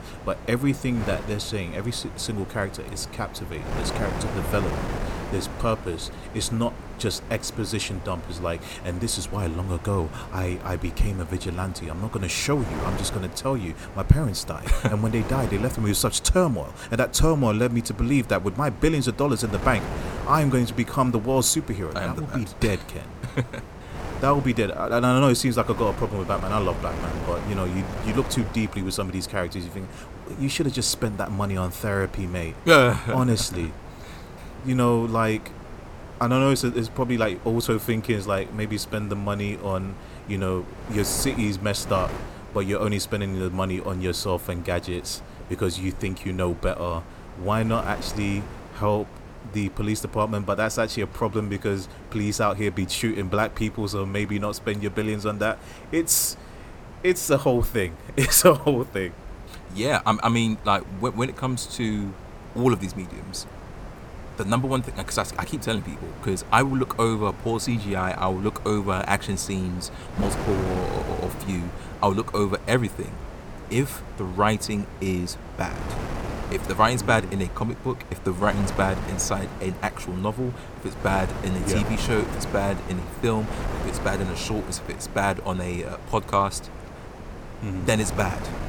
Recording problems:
wind noise on the microphone; occasional gusts; 15 dB below the speech

